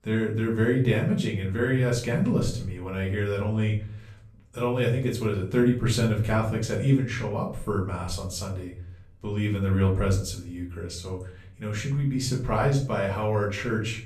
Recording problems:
off-mic speech; far
room echo; slight; dies away in 0.4 s

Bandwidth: 13.5 kHz